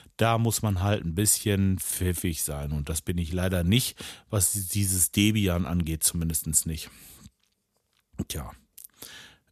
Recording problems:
none

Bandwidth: 14 kHz